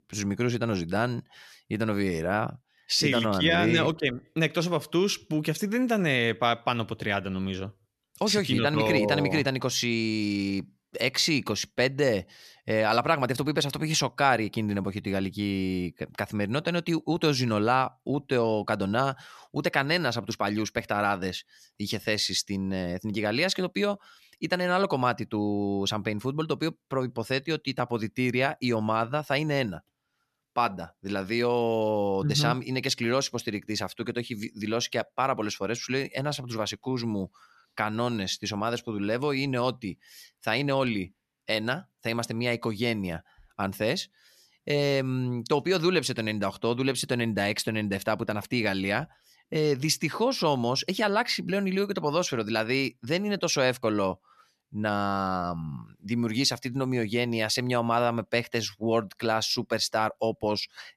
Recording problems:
none

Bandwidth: 13.5 kHz